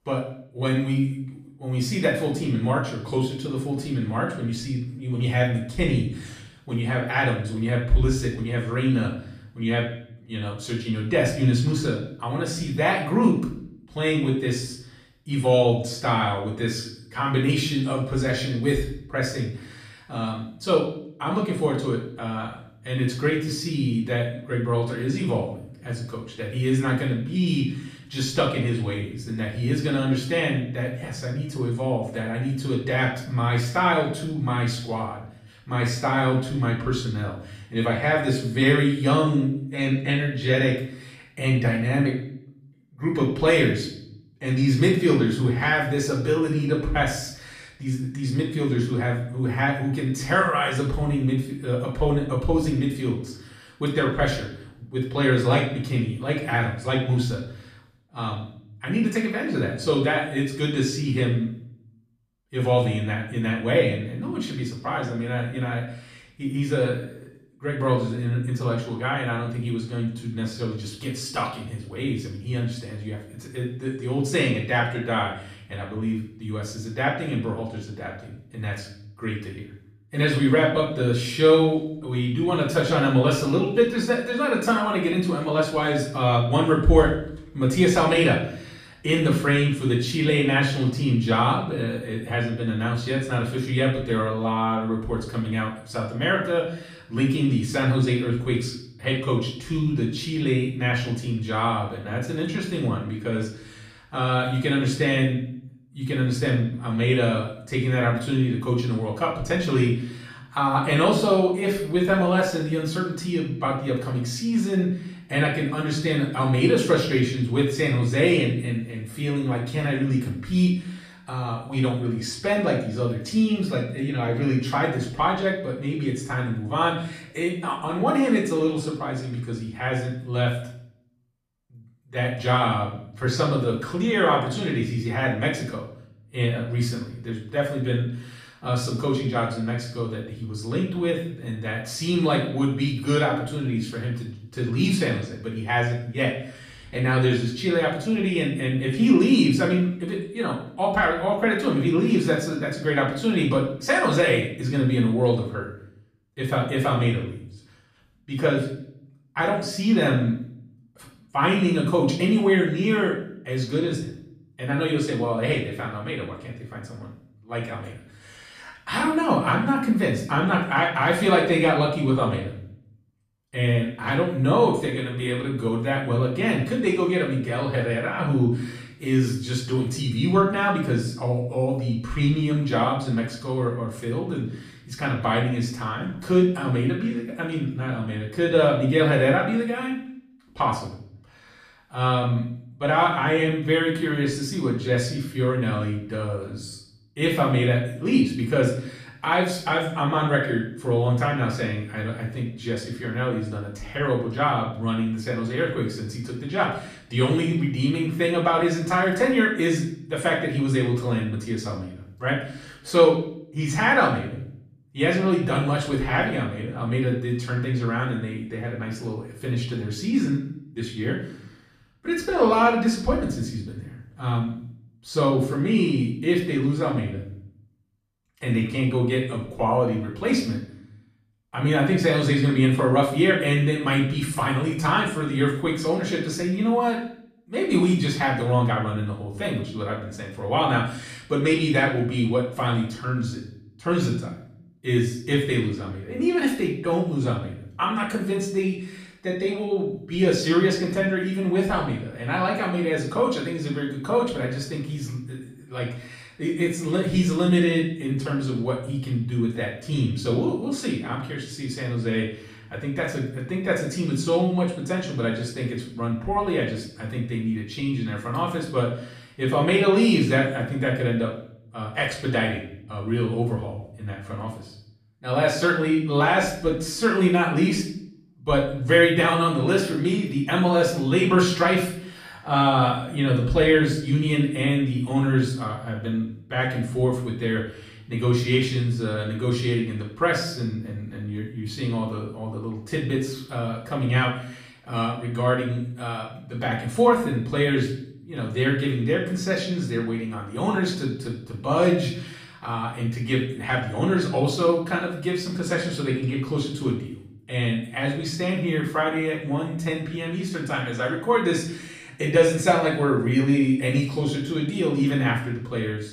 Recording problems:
off-mic speech; far
room echo; noticeable; dies away in 0.6 s

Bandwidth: 14.5 kHz